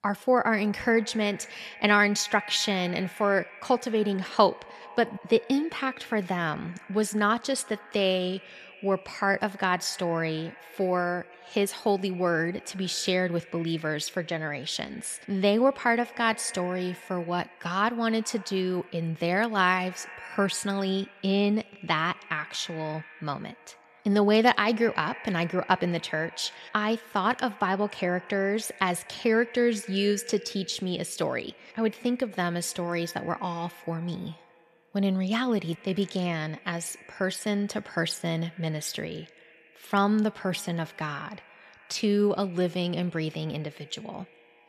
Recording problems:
echo of what is said; faint; throughout; 120 ms later, 20 dB below the speech

